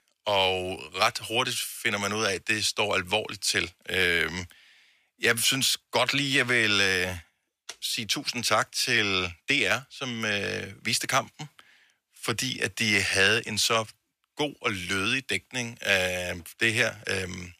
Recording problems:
thin; somewhat; fading below 500 Hz

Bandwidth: 14.5 kHz